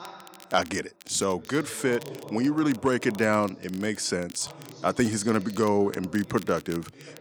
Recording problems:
voice in the background; noticeable; throughout; 20 dB below the speech
crackle, like an old record; faint; 20 dB below the speech

